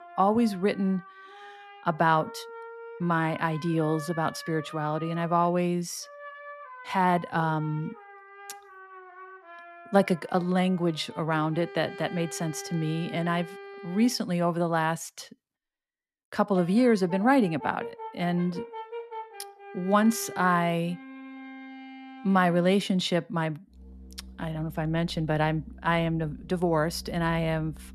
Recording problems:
background music; noticeable; throughout; 15 dB below the speech

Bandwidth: 13.5 kHz